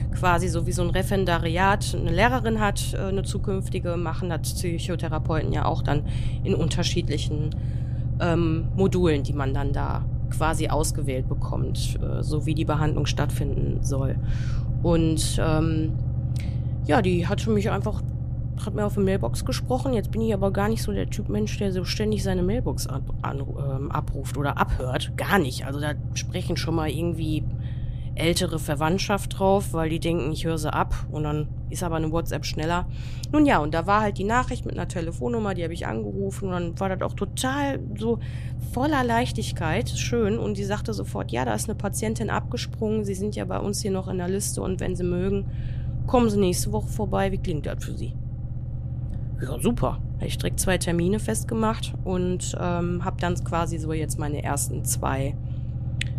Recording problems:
low rumble; noticeable; throughout; 15 dB below the speech

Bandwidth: 14.5 kHz